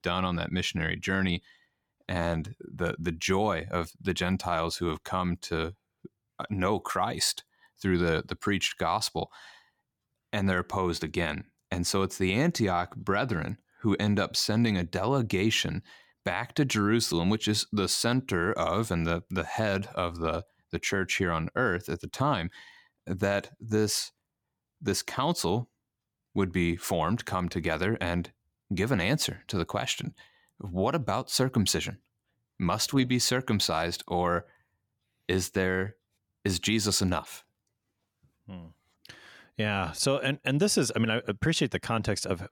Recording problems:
none

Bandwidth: 18.5 kHz